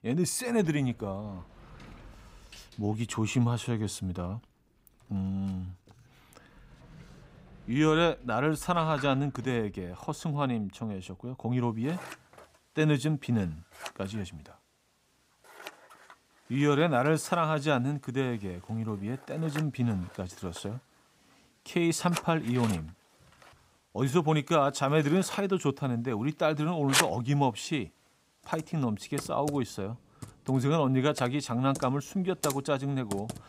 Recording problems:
household noises; loud; throughout; 9 dB below the speech

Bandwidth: 15.5 kHz